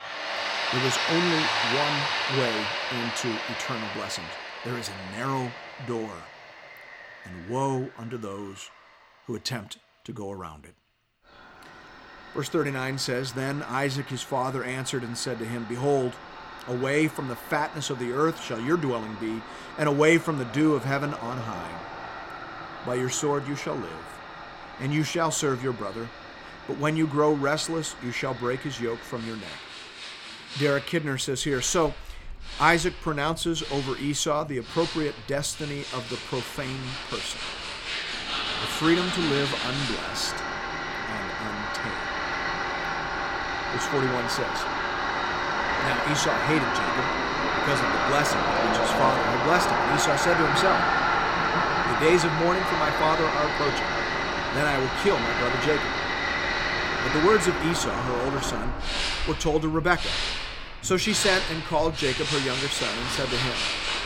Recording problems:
machinery noise; very loud; throughout; as loud as the speech

